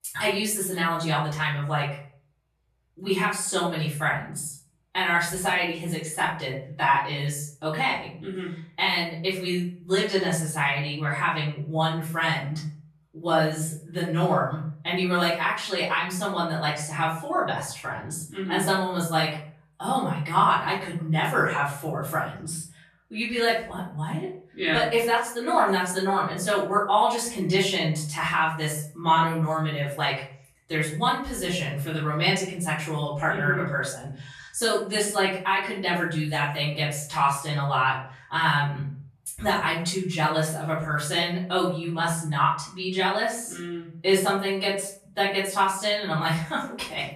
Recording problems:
off-mic speech; far
room echo; noticeable; dies away in 0.4 s

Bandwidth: 13.5 kHz